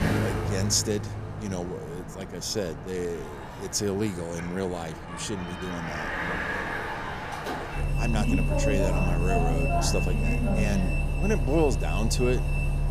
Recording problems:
traffic noise; very loud; throughout; 2 dB above the speech

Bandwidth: 14.5 kHz